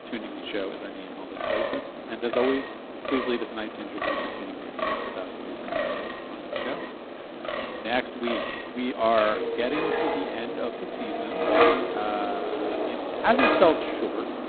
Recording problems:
phone-call audio; poor line; nothing above 4 kHz
wind in the background; very loud; throughout; as loud as the speech

